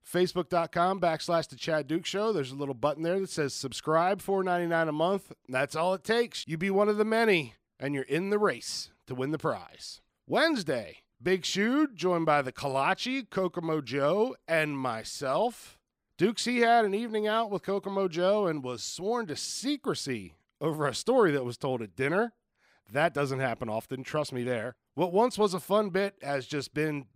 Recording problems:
none

